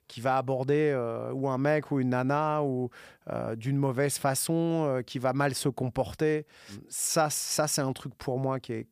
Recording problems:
none

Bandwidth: 15 kHz